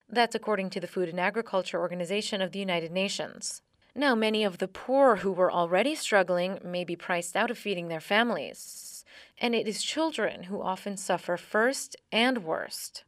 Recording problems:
audio stuttering; at 8.5 s

